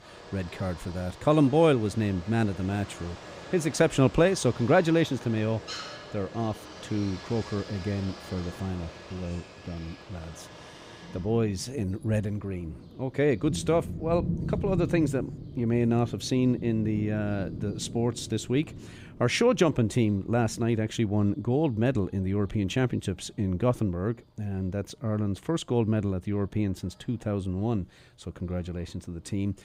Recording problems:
rain or running water; noticeable; throughout; 15 dB below the speech

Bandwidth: 15.5 kHz